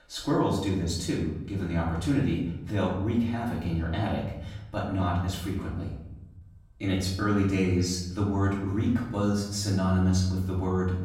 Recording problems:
off-mic speech; far
room echo; noticeable; dies away in 0.9 s

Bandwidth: 16 kHz